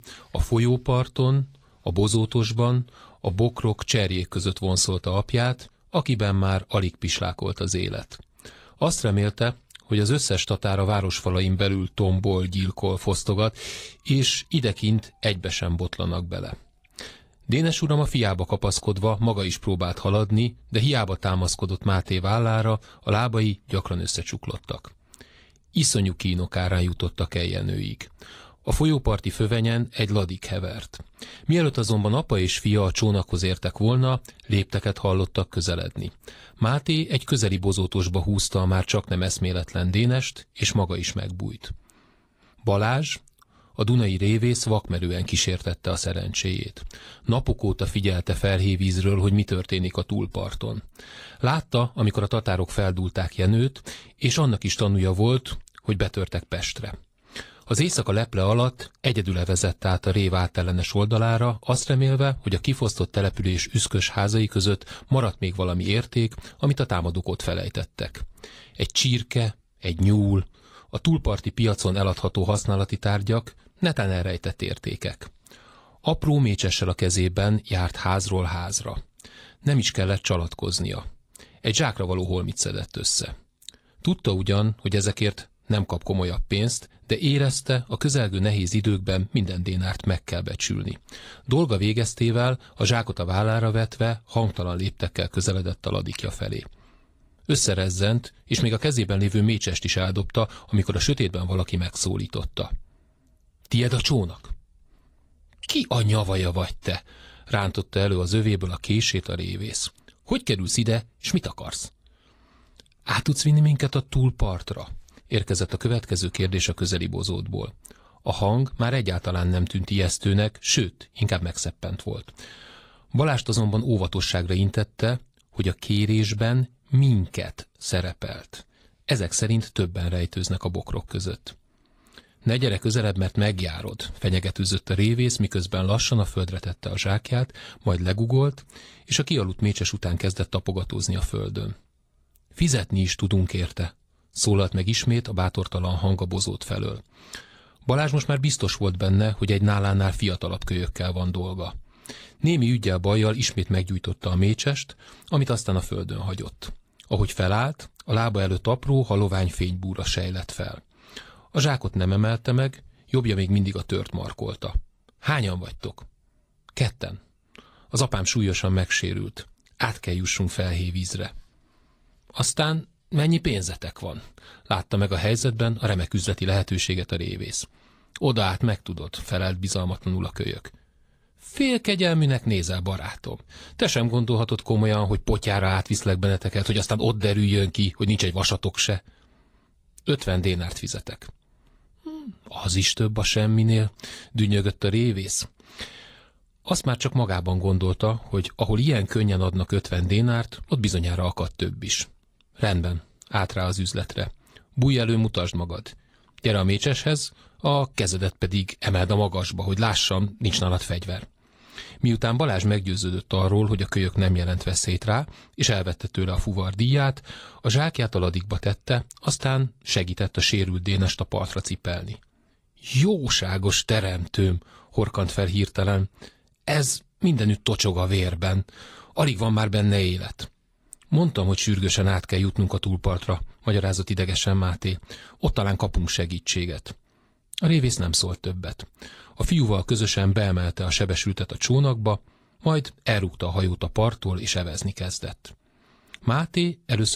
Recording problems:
garbled, watery; slightly; nothing above 15 kHz
abrupt cut into speech; at the end

